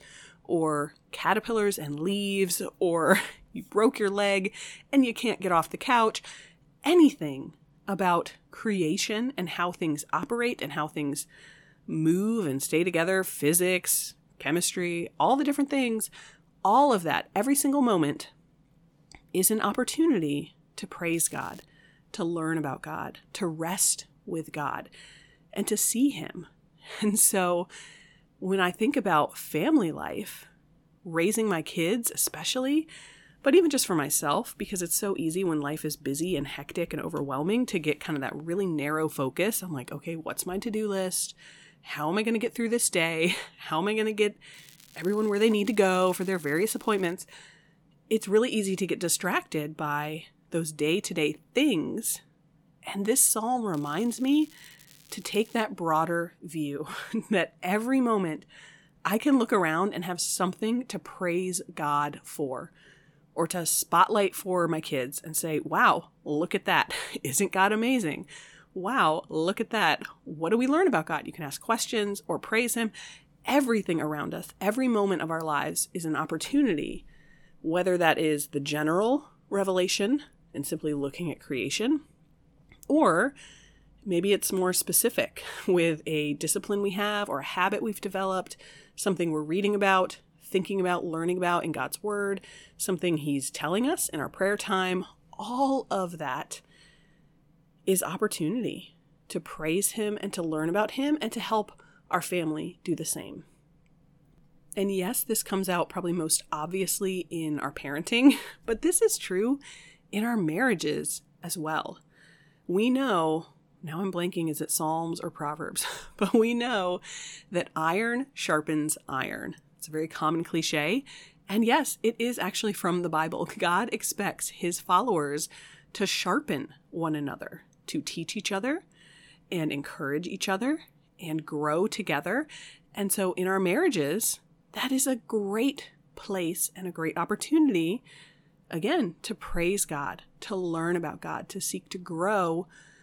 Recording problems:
crackling; faint; at 21 s, from 45 to 47 s and from 54 to 56 s; 25 dB below the speech

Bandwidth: 18 kHz